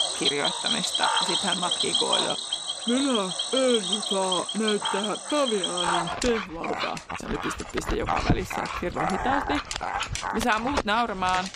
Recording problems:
animal sounds; very loud; throughout; 2 dB above the speech

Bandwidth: 15 kHz